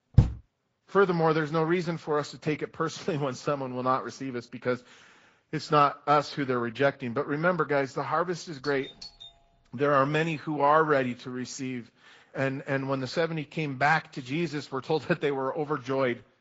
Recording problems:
garbled, watery; slightly; nothing above 7.5 kHz
high frequencies cut off; slight
door banging; loud; at the start; peak 3 dB above the speech
doorbell; faint; at 8.5 s; peak 15 dB below the speech

